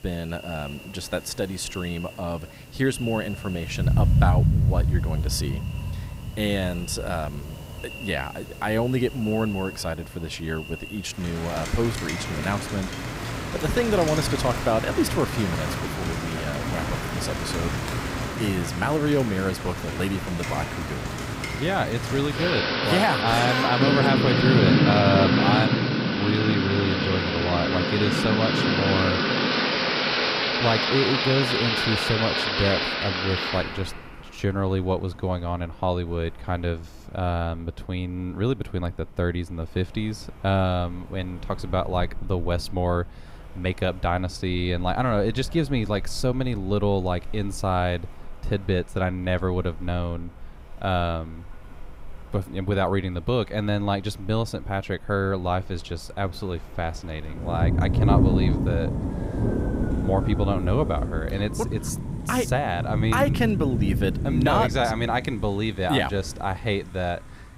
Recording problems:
rain or running water; very loud; throughout; 1 dB above the speech

